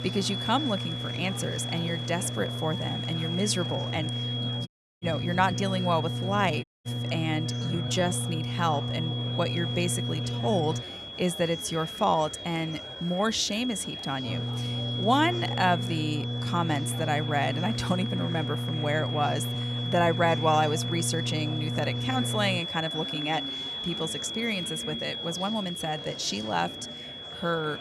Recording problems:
high-pitched whine; loud; throughout; 3.5 kHz, 6 dB below the speech
electrical hum; noticeable; until 11 s and from 14 to 23 s; 60 Hz, 15 dB below the speech
murmuring crowd; noticeable; throughout; 15 dB below the speech
uneven, jittery; strongly; from 3.5 to 26 s
audio cutting out; at 4.5 s and at 6.5 s

